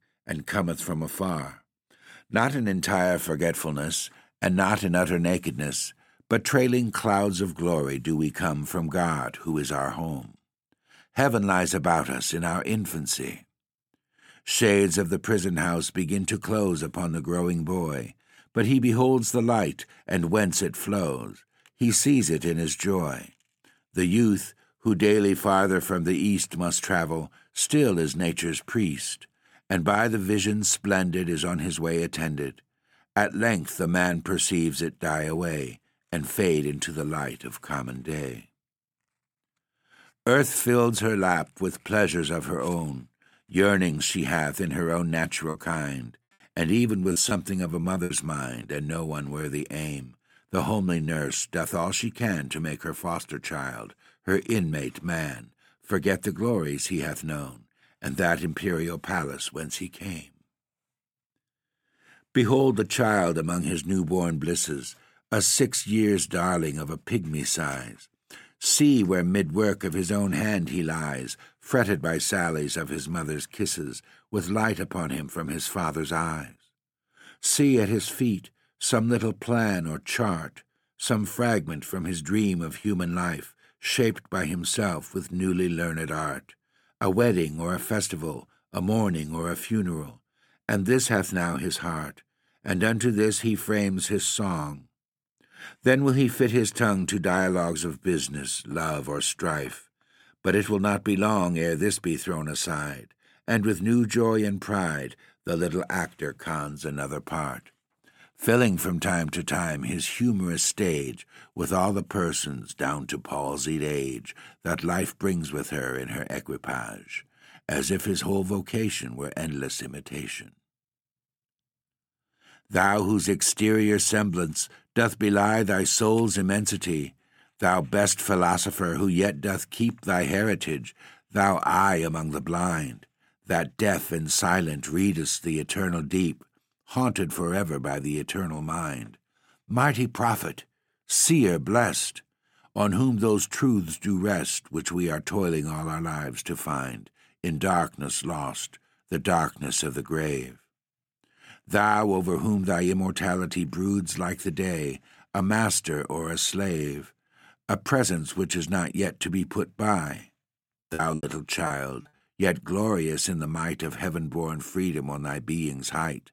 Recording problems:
choppy; very; from 45 to 49 s and from 2:41 to 2:42; 9% of the speech affected

